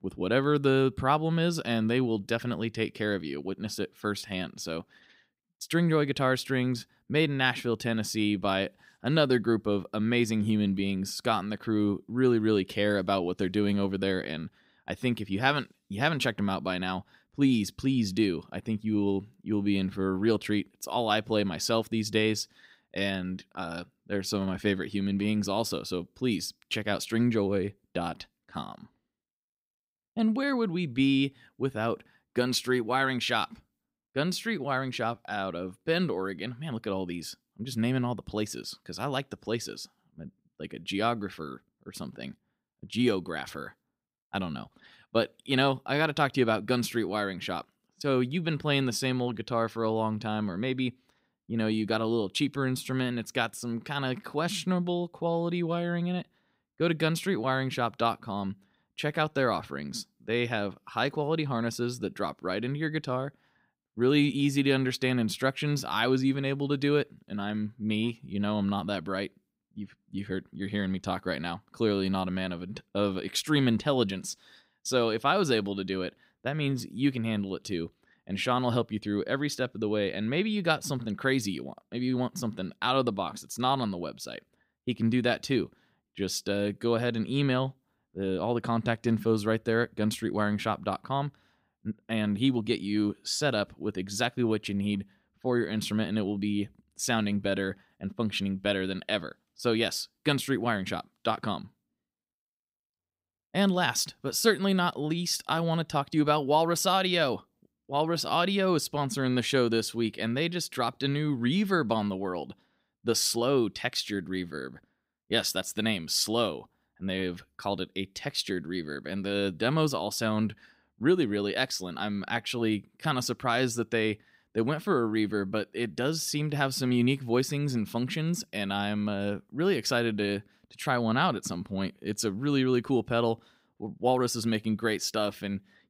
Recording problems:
none

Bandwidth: 15.5 kHz